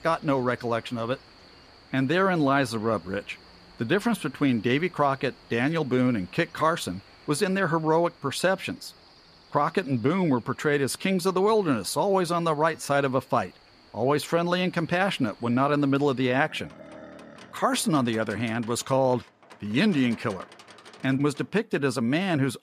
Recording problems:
animal sounds; faint; throughout; 25 dB below the speech

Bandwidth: 14.5 kHz